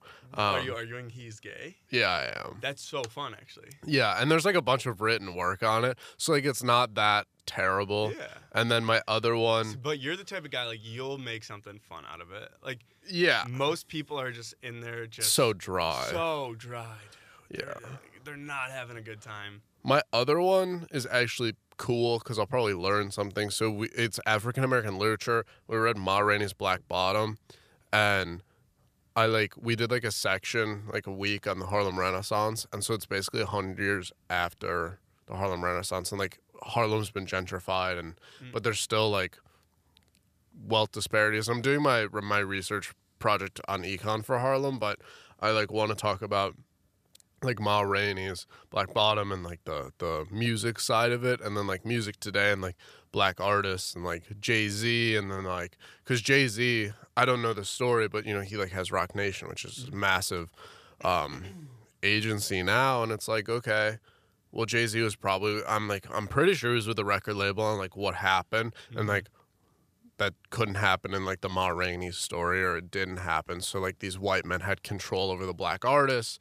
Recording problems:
none

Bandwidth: 14.5 kHz